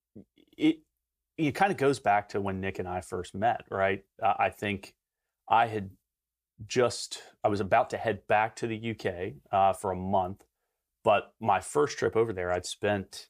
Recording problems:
none

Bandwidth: 15 kHz